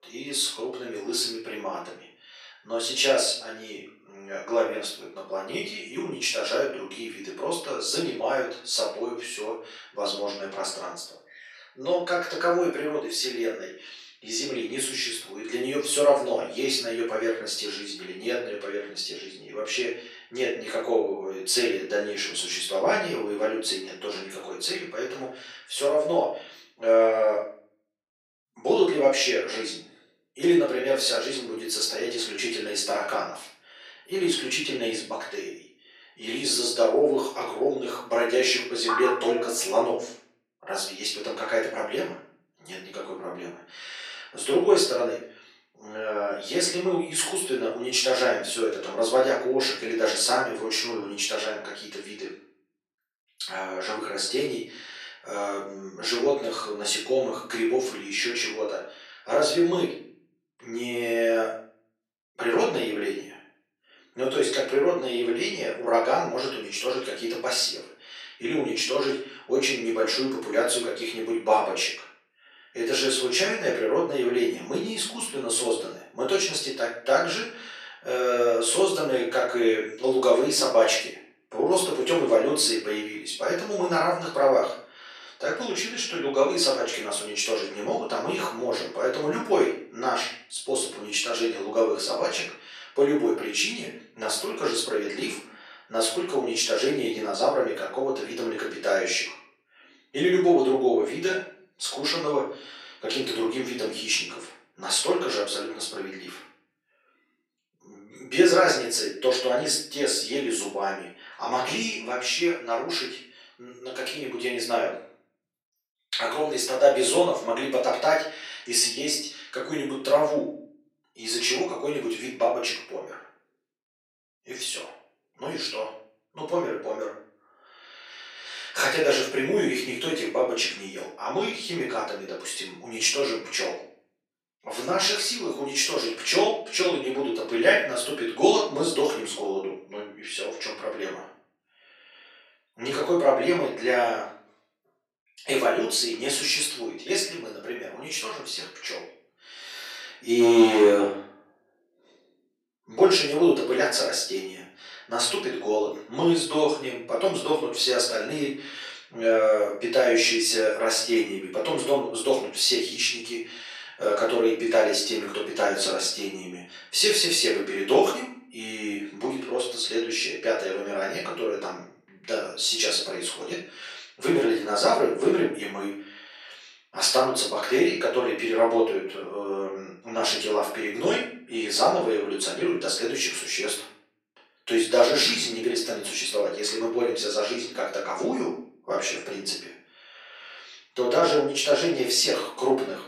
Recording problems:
off-mic speech; far
thin; very; fading below 450 Hz
room echo; noticeable; dies away in 0.5 s

